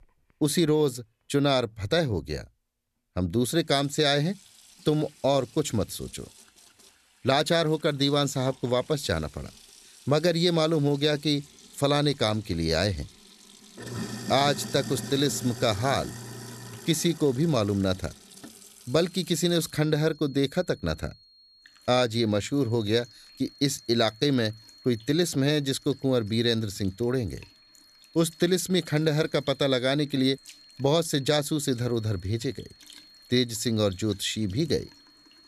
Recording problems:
household noises; noticeable; throughout; 20 dB below the speech
high-pitched whine; faint; from 19 s on; 4.5 kHz, 25 dB below the speech

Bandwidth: 14 kHz